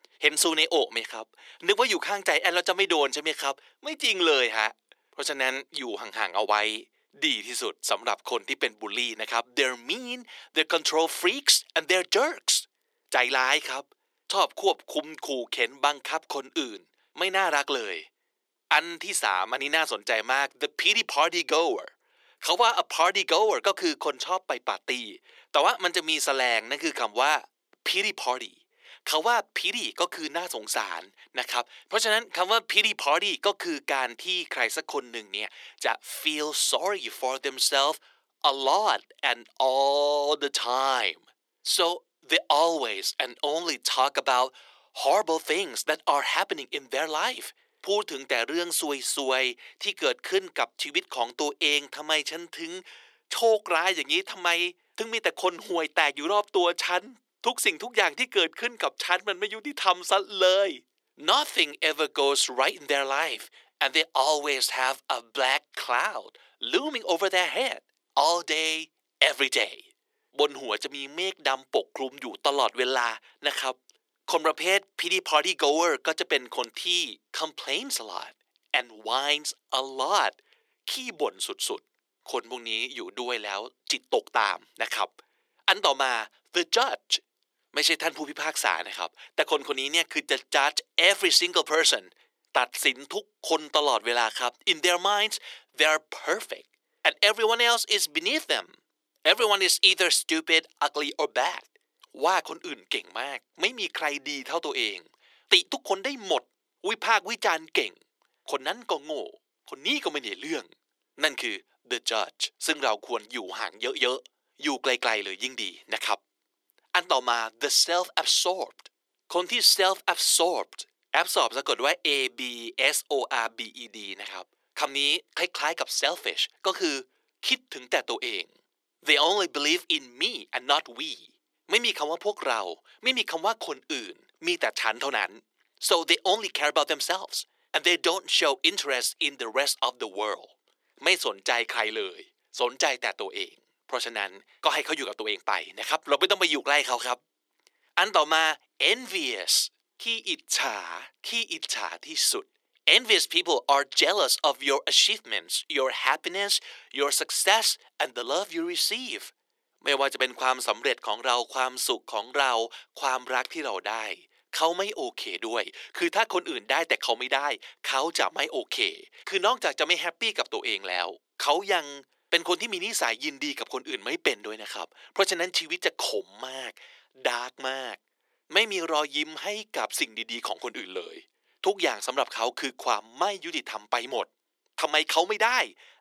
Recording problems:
thin; very; fading below 350 Hz

